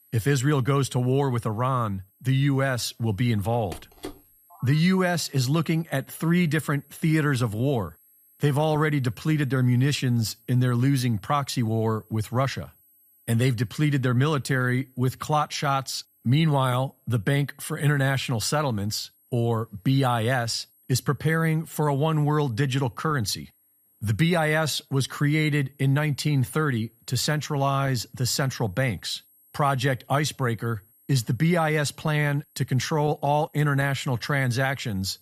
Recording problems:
high-pitched whine; faint; throughout; 11.5 kHz, 35 dB below the speech
phone ringing; faint; from 3.5 to 4.5 s; peak 15 dB below the speech

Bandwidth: 15 kHz